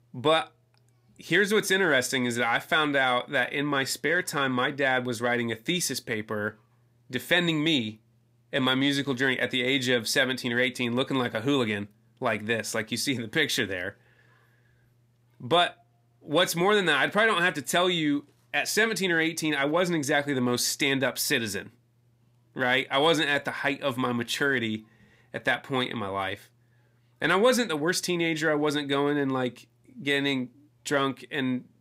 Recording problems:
none

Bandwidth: 15.5 kHz